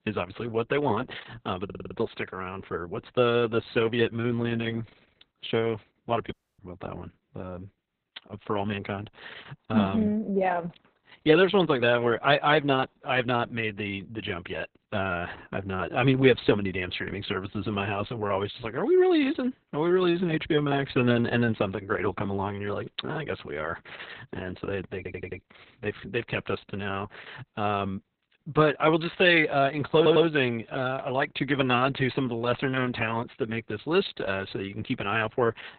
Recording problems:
garbled, watery; badly; nothing above 4 kHz
audio stuttering; at 1.5 s, at 25 s and at 30 s
audio cutting out; at 6.5 s

